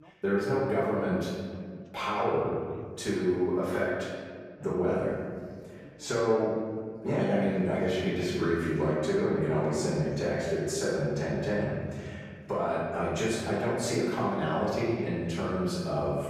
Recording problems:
room echo; strong; dies away in 1.7 s
off-mic speech; far
voice in the background; faint; throughout; 30 dB below the speech

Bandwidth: 15 kHz